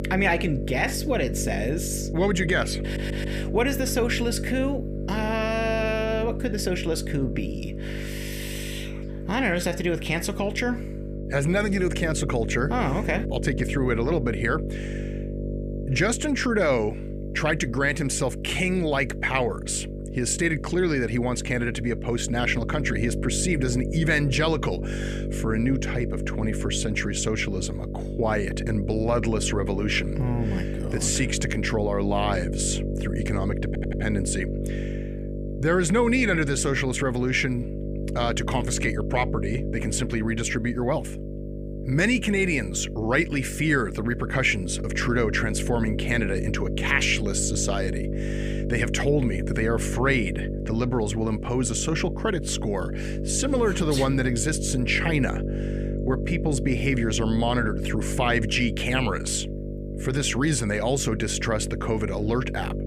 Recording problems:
electrical hum; noticeable; throughout; 50 Hz, 10 dB below the speech
audio stuttering; at 3 s and at 34 s

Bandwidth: 15 kHz